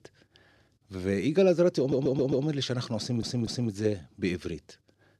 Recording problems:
audio stuttering; at 2 s and at 3 s

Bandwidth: 14 kHz